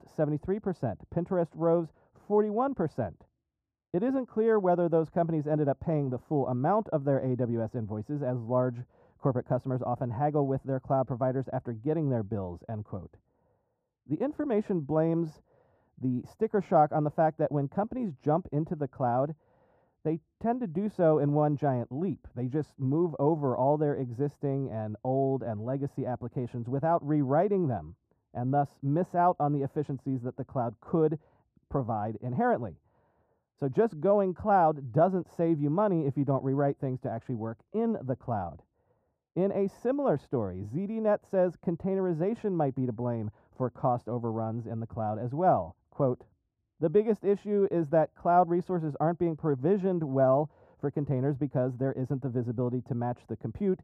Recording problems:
muffled; very; fading above 1.5 kHz

